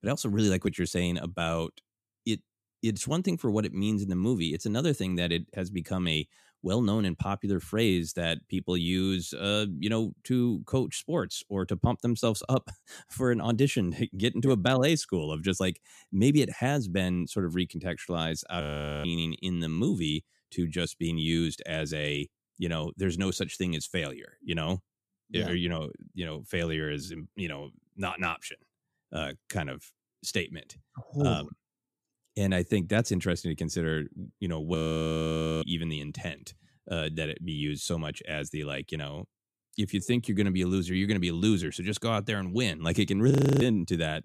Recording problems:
audio freezing; at 19 s, at 35 s for 1 s and at 43 s

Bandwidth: 14.5 kHz